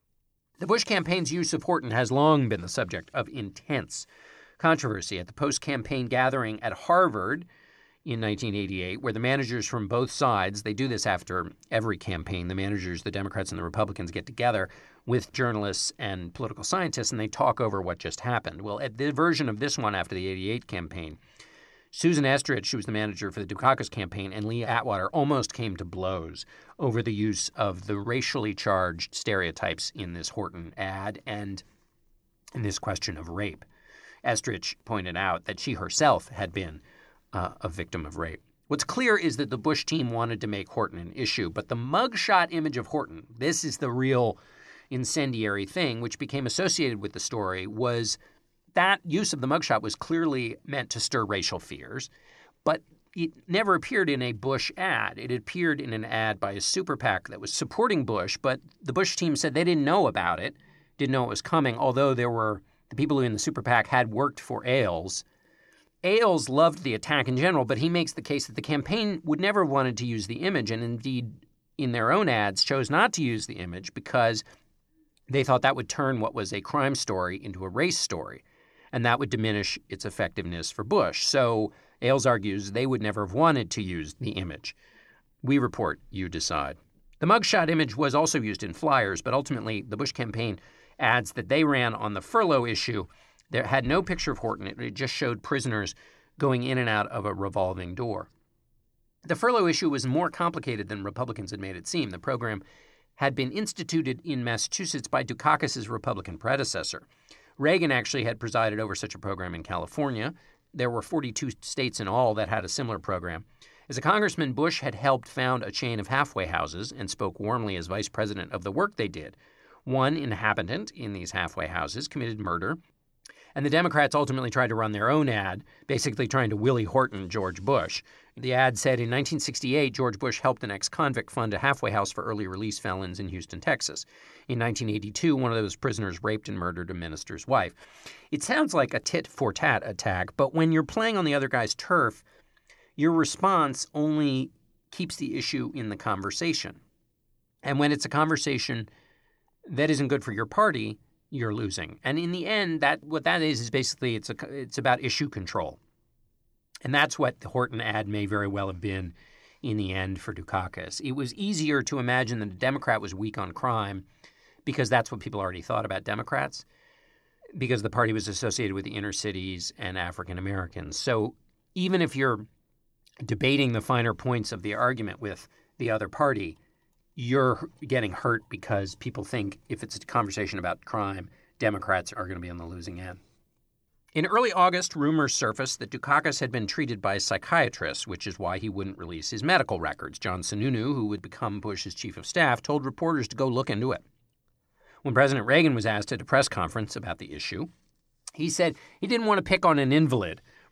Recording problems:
none

